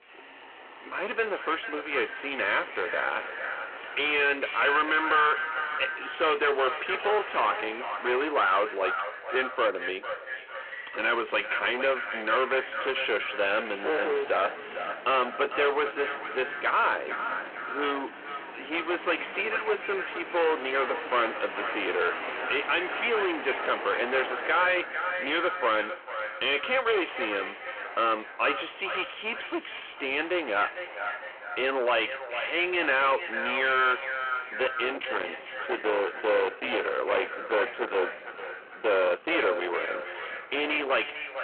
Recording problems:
distortion; heavy; 19% of the sound clipped
echo of what is said; strong; throughout; 450 ms later, 8 dB below the speech
phone-call audio
traffic noise; noticeable; throughout; 15 dB below the speech

